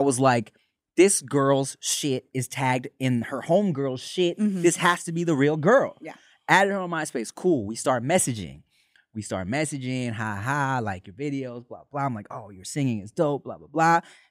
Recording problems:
abrupt cut into speech; at the start

